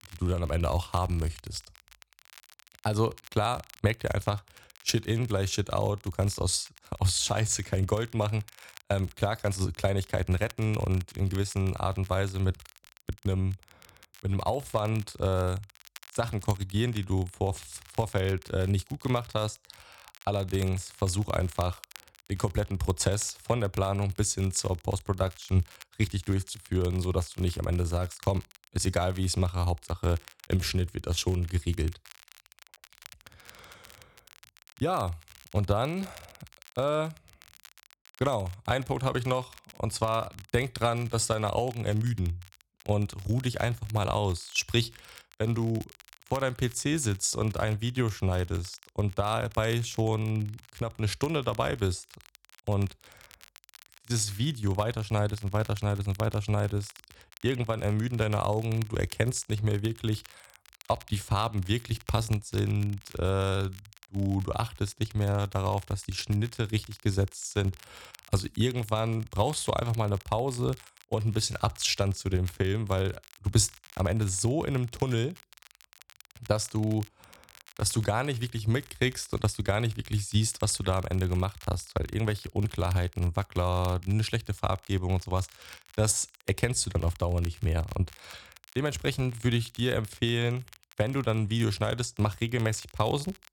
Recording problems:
crackle, like an old record; faint; 20 dB below the speech

